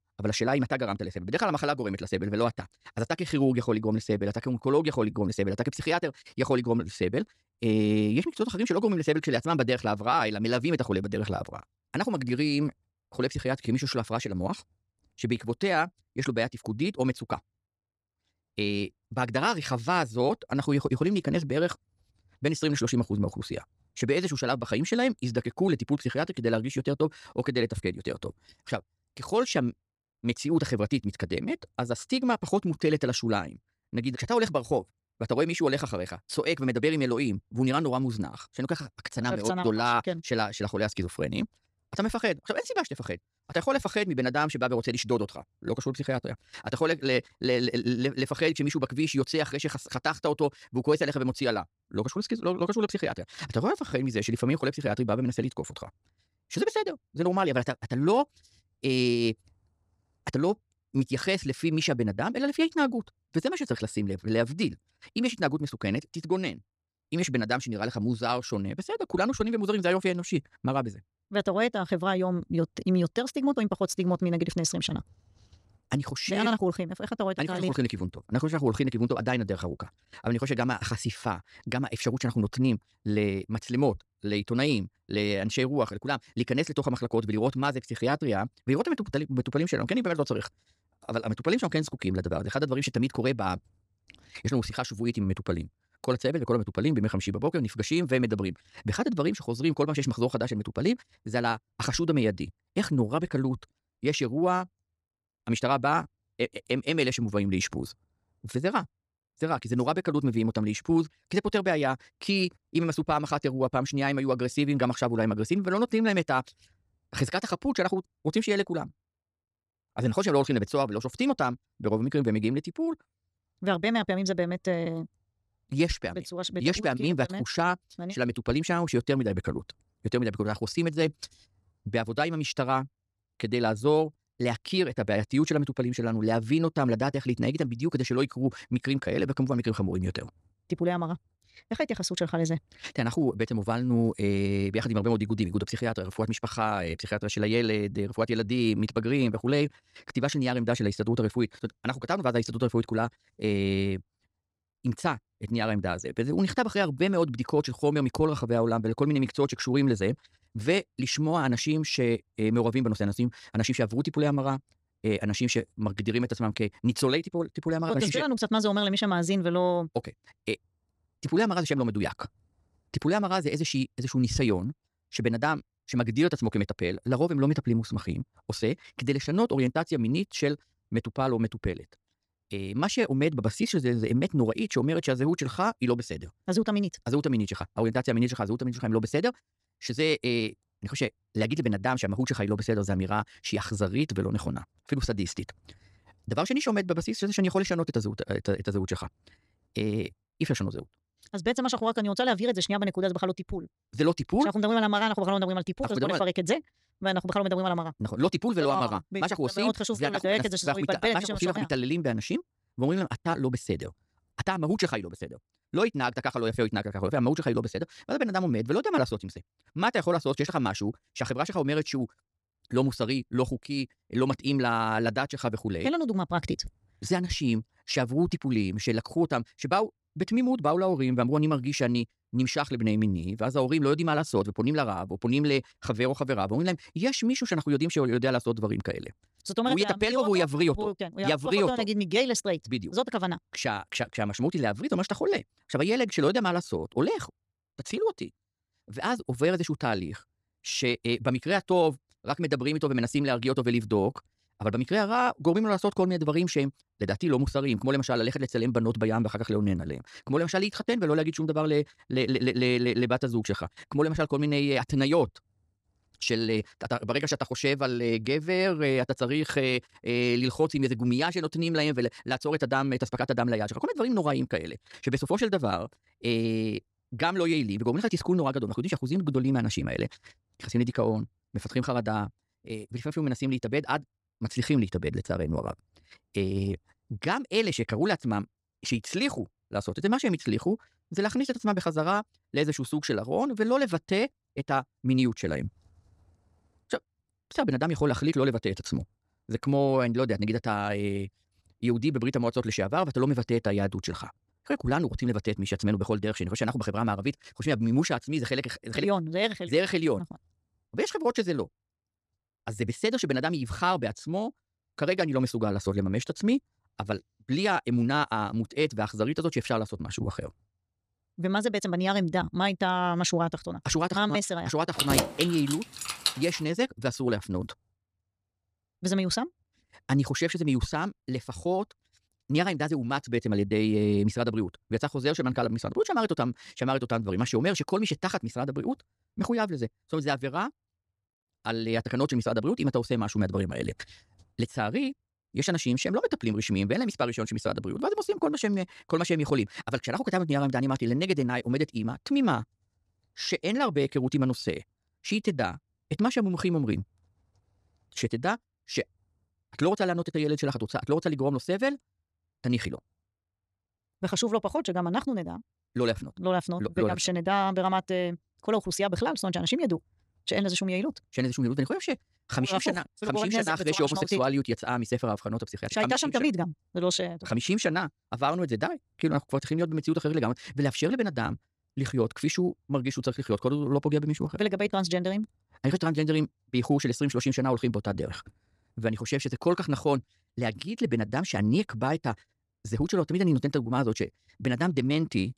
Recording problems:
wrong speed, natural pitch; too fast; 1.5 times normal speed
jangling keys; loud; from 5:25 to 5:27; peak 3 dB above the speech

